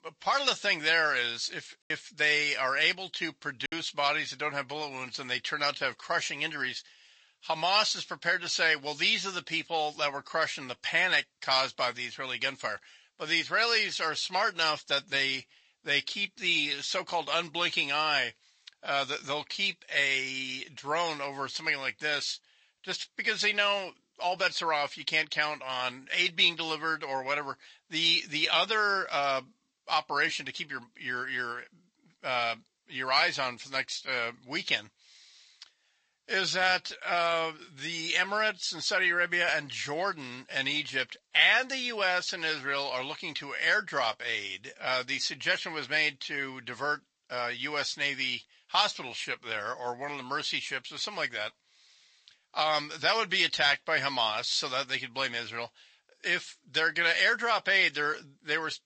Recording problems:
thin; somewhat; fading below 1 kHz
garbled, watery; slightly; nothing above 8 kHz
choppy; very; from 2 to 3.5 s; 8% of the speech affected

